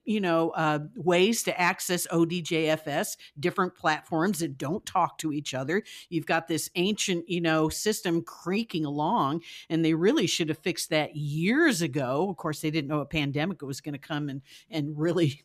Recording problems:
none

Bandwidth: 14.5 kHz